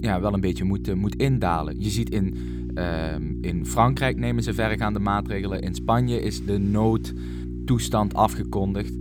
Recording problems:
electrical hum; noticeable; throughout; 60 Hz, 15 dB below the speech

